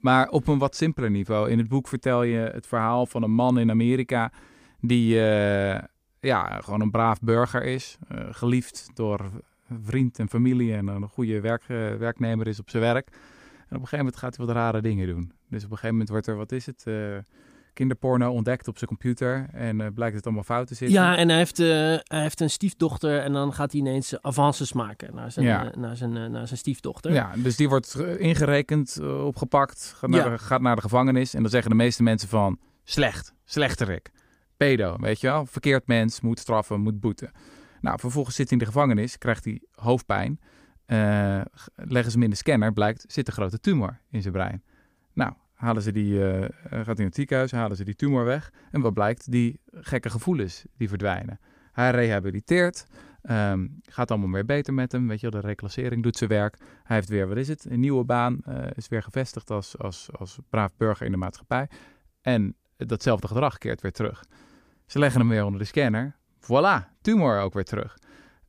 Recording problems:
none

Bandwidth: 15 kHz